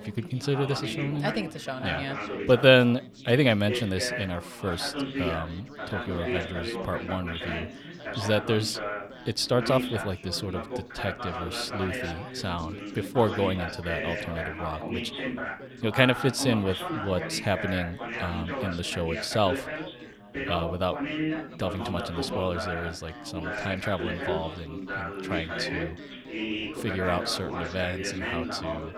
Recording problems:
background chatter; loud; throughout; 4 voices, 5 dB below the speech

